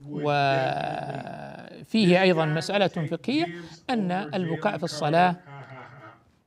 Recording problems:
voice in the background; noticeable; throughout; 15 dB below the speech

